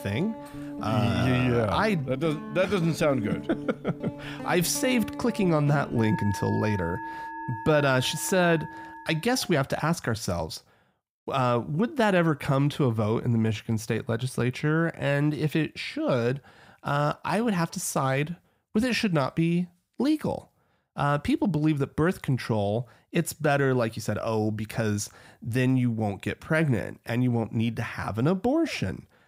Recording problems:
background music; noticeable; until 9.5 s; 10 dB below the speech

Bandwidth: 15.5 kHz